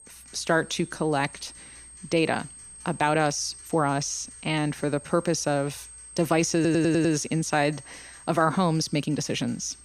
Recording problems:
high-pitched whine; noticeable; throughout; 8.5 kHz, 20 dB below the speech
household noises; faint; throughout; 25 dB below the speech
uneven, jittery; slightly; from 3 to 9 s
audio stuttering; at 6.5 s

